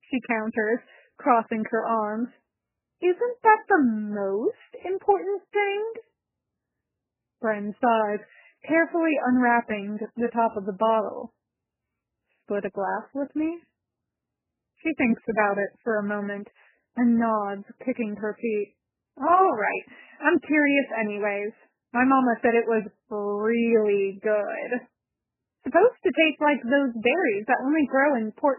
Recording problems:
garbled, watery; badly; nothing above 3 kHz

